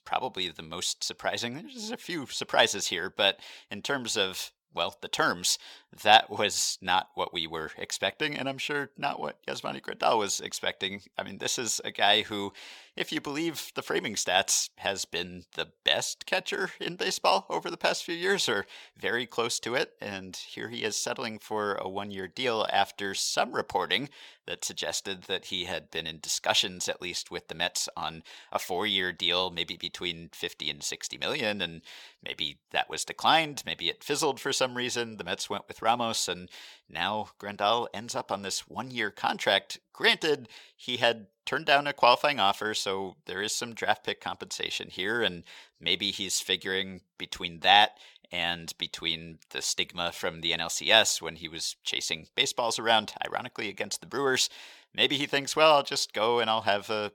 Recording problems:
thin; somewhat; fading below 350 Hz

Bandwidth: 17.5 kHz